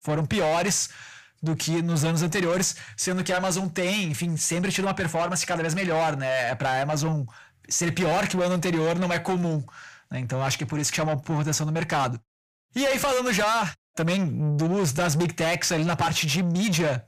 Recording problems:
distortion; heavy; 8 dB below the speech

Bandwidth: 15 kHz